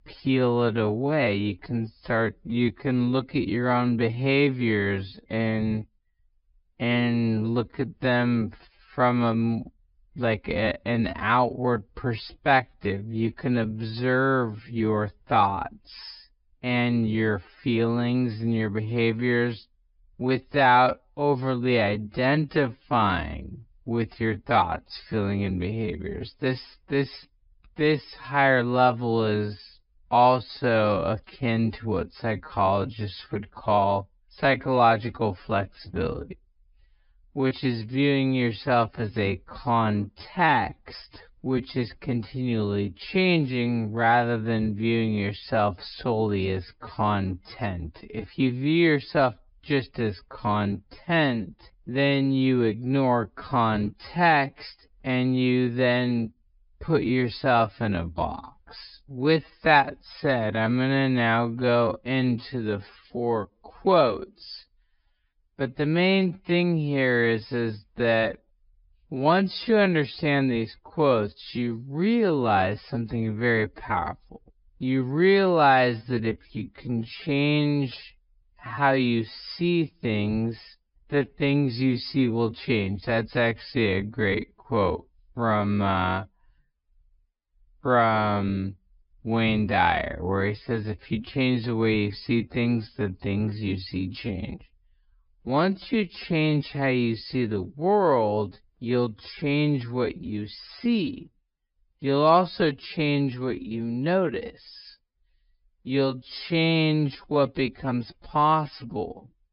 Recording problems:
wrong speed, natural pitch; too slow; 0.5 times normal speed
high frequencies cut off; noticeable; nothing above 5.5 kHz

